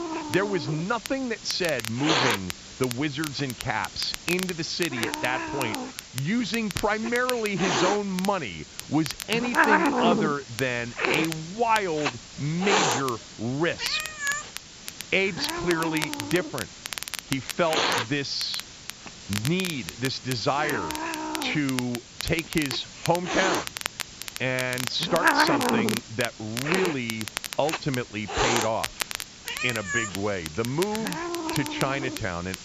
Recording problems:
high frequencies cut off; noticeable; nothing above 8 kHz
hiss; loud; throughout; as loud as the speech
crackle, like an old record; loud; 8 dB below the speech

